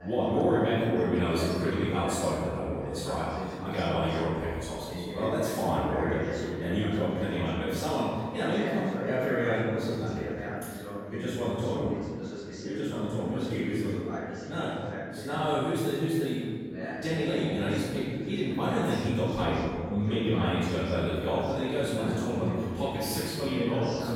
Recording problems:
room echo; strong; dies away in 1.8 s
off-mic speech; far
background chatter; loud; throughout; 3 voices, 8 dB below the speech

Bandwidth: 16.5 kHz